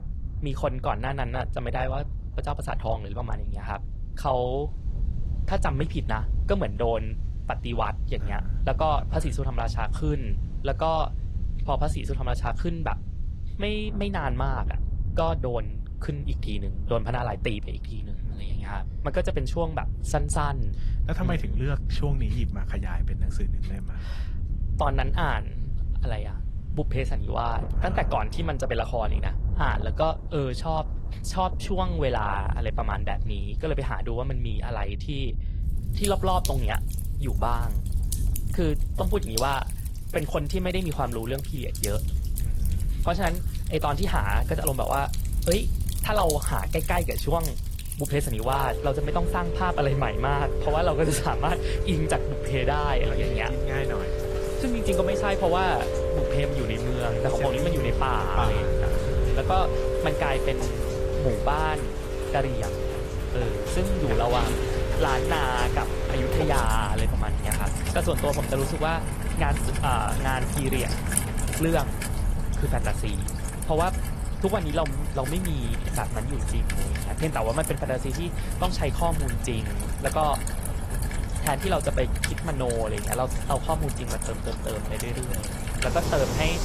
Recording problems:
garbled, watery; slightly
rain or running water; loud; throughout; 3 dB below the speech
wind noise on the microphone; occasional gusts; 20 dB below the speech

